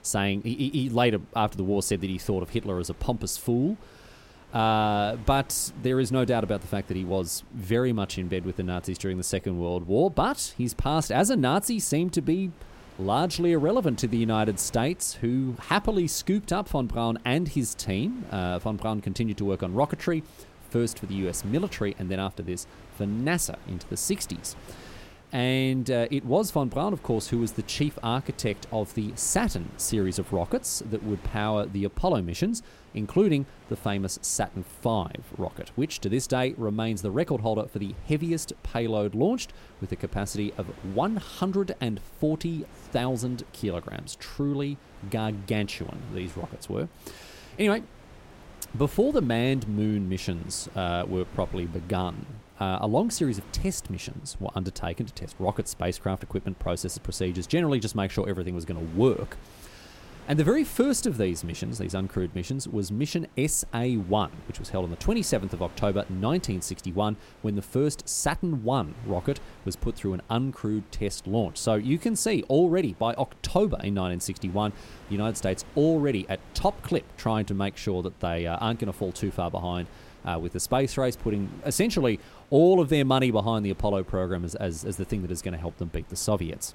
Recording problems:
wind noise on the microphone; occasional gusts; 25 dB below the speech

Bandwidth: 16 kHz